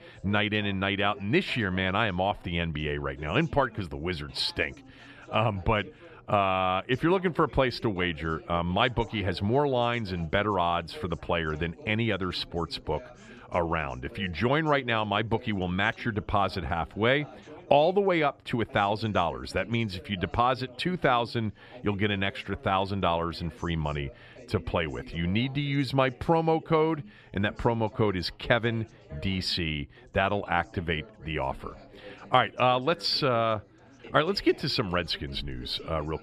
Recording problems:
background chatter; faint; throughout; 4 voices, 20 dB below the speech

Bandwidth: 14 kHz